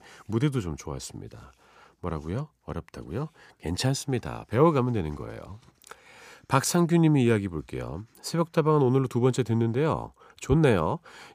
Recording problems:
none

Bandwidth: 15 kHz